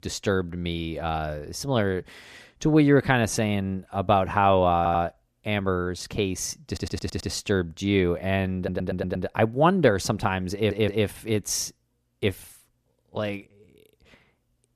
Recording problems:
audio stuttering; 4 times, first at 5 s

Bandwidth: 14.5 kHz